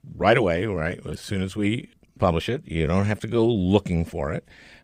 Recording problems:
uneven, jittery; strongly; from 0.5 to 4 s

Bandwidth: 15.5 kHz